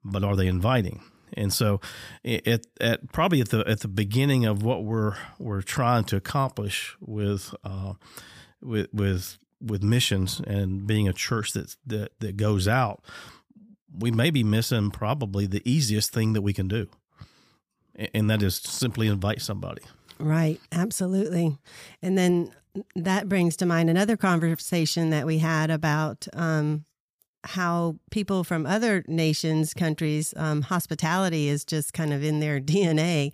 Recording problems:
none

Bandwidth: 15 kHz